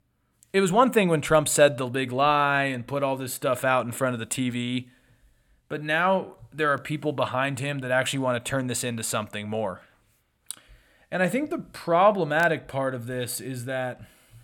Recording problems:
none

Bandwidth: 17.5 kHz